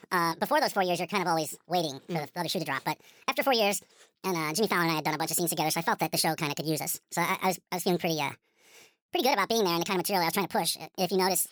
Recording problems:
wrong speed and pitch; too fast and too high; 1.6 times normal speed

